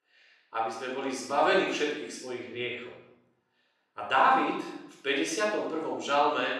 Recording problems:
off-mic speech; far
room echo; noticeable; dies away in 0.8 s
thin; very slightly; fading below 300 Hz

